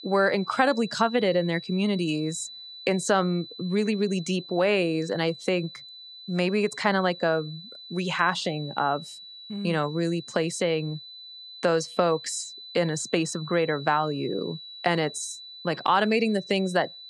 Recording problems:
high-pitched whine; noticeable; throughout; 4 kHz, 15 dB below the speech

